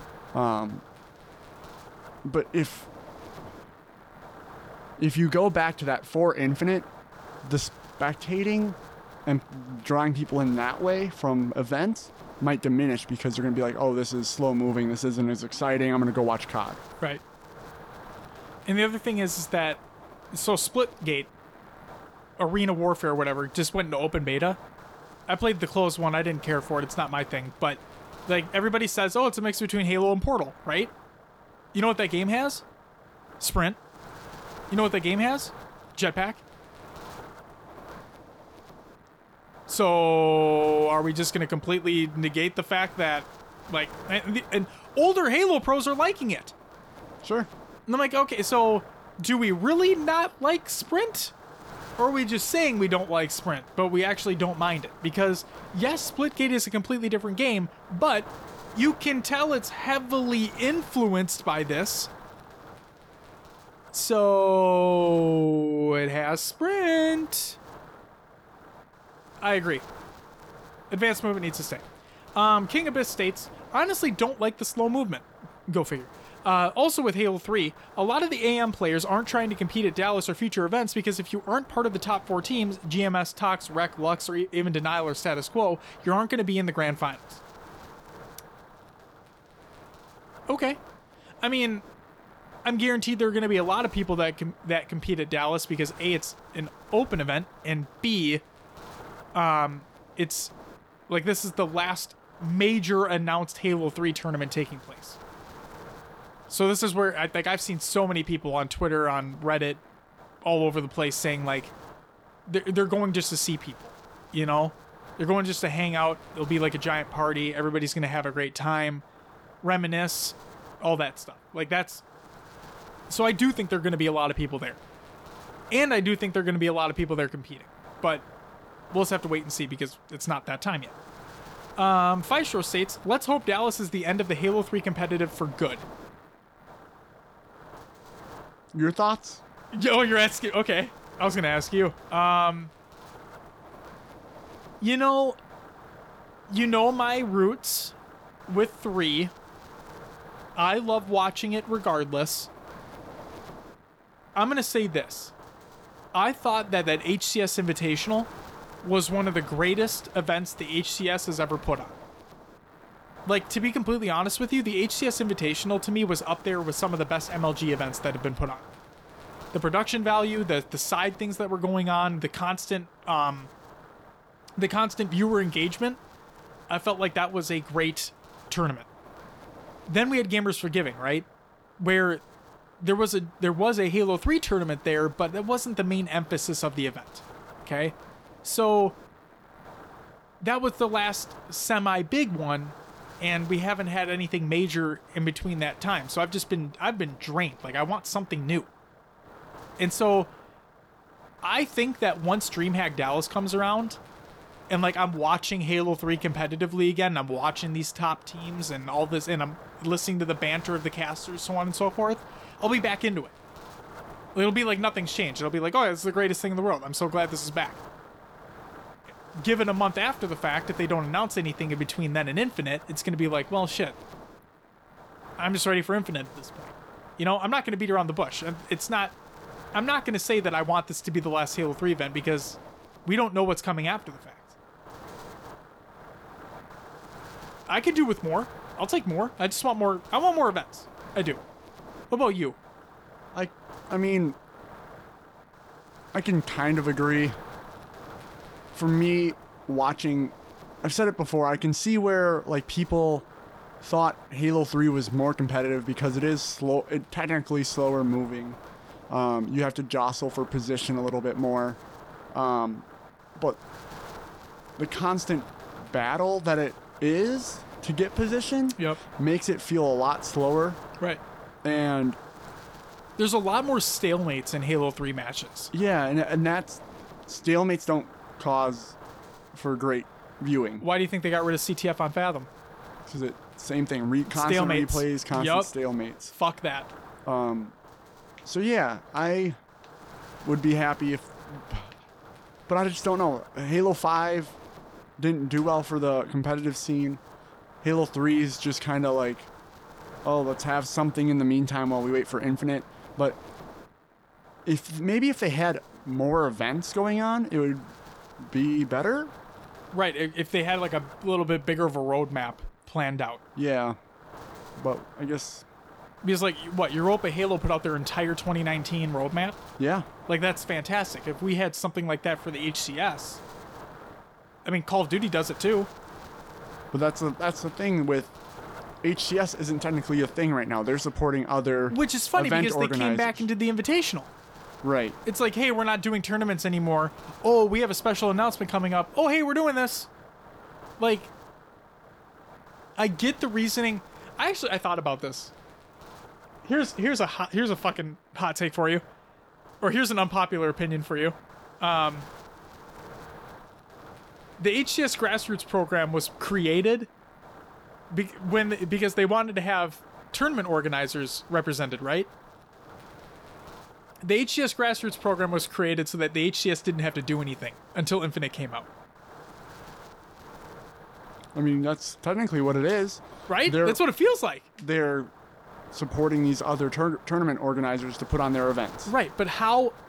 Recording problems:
wind noise on the microphone; occasional gusts; 20 dB below the speech

